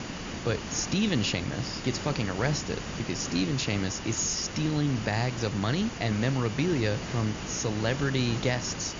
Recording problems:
high frequencies cut off; noticeable; nothing above 7 kHz
hiss; loud; throughout; 7 dB below the speech

